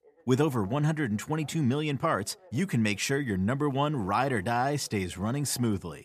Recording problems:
voice in the background; faint; throughout; 30 dB below the speech

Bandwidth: 14.5 kHz